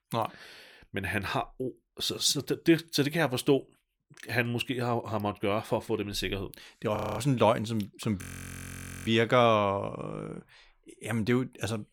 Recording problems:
audio freezing; at 7 s and at 8 s for 1 s

